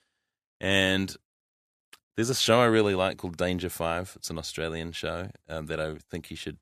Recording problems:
none

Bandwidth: 14 kHz